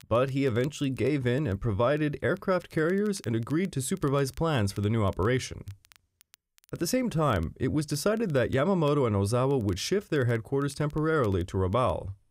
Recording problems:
crackle, like an old record; faint; 30 dB below the speech

